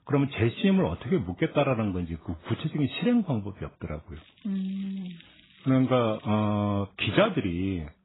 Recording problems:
garbled, watery; badly; nothing above 4 kHz
crackling; faint; from 4 to 6.5 s; 25 dB below the speech

